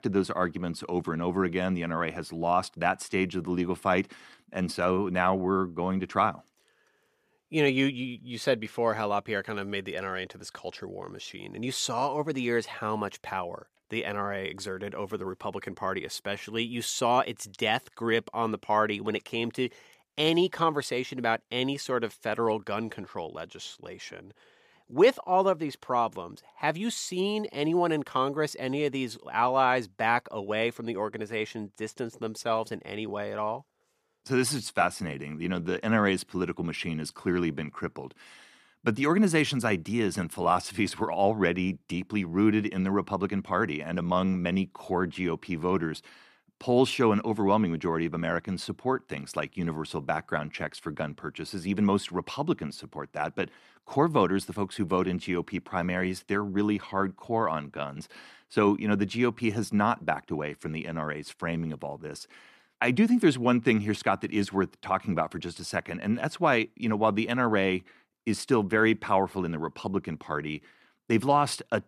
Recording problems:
none

